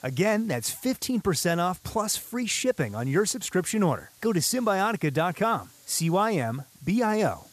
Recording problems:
hiss; faint; throughout; 25 dB below the speech

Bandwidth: 14.5 kHz